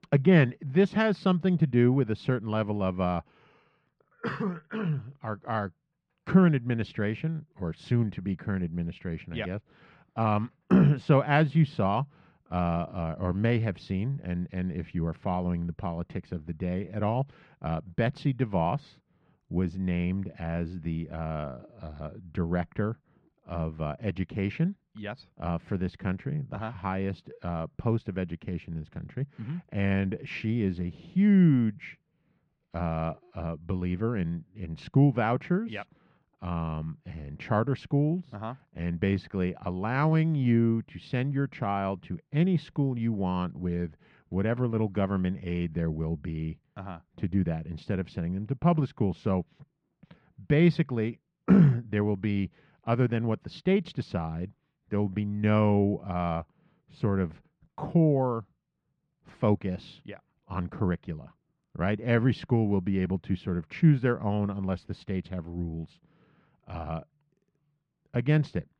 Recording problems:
muffled; slightly; fading above 2.5 kHz

